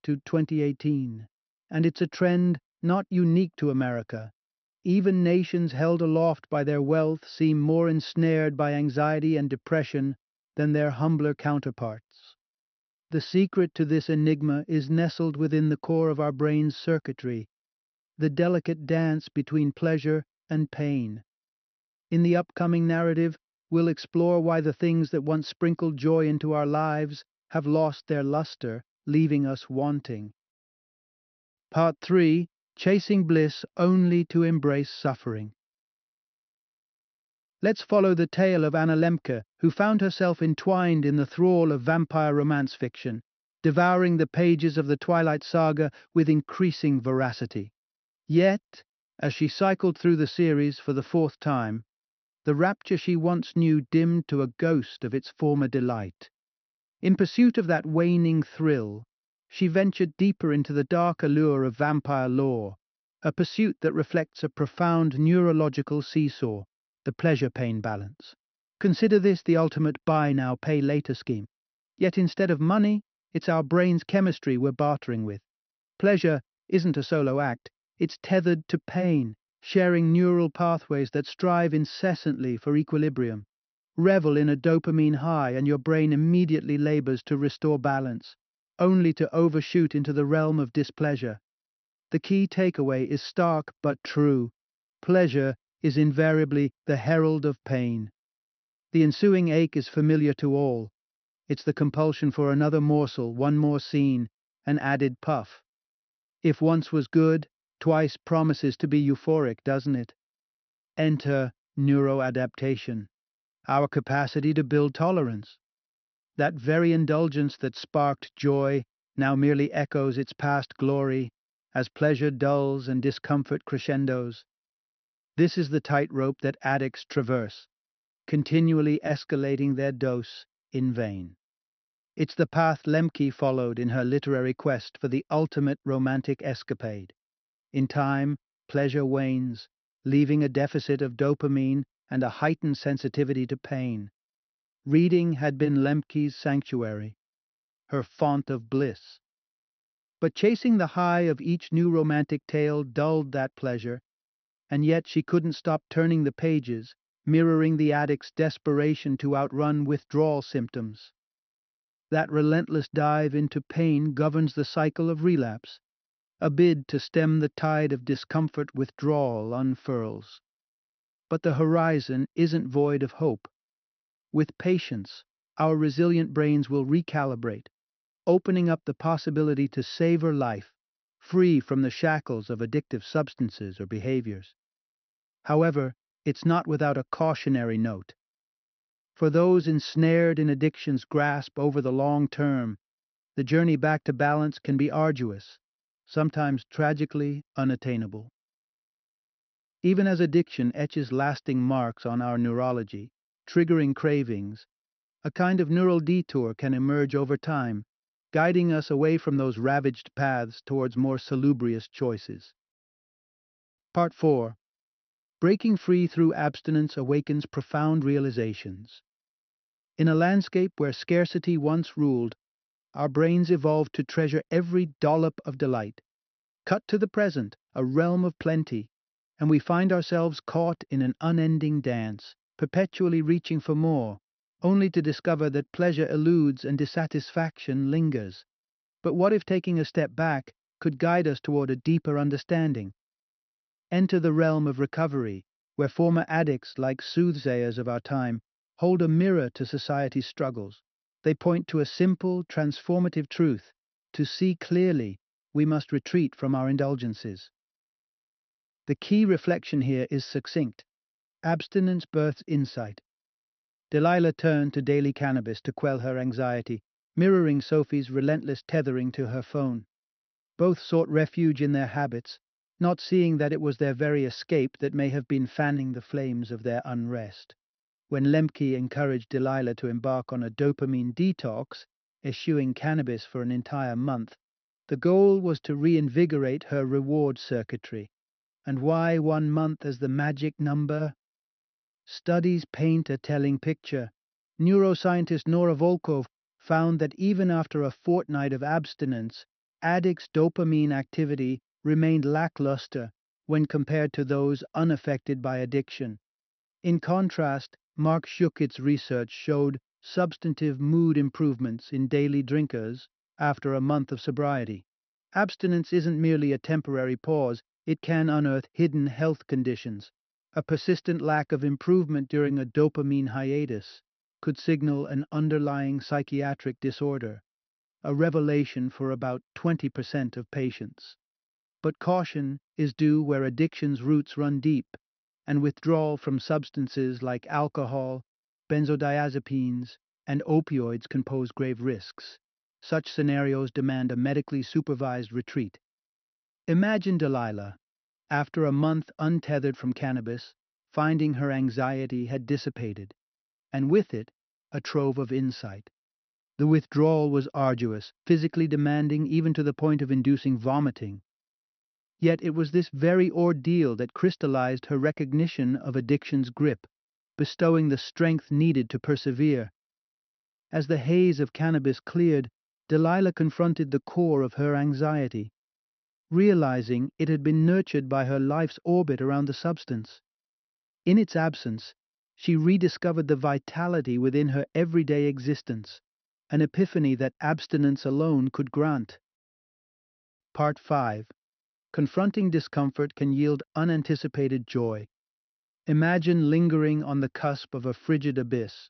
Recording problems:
high frequencies cut off; noticeable; nothing above 6 kHz

